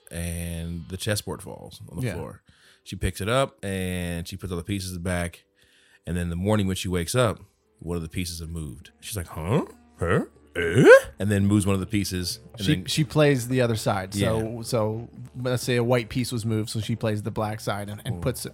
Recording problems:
background music; faint; throughout; 25 dB below the speech

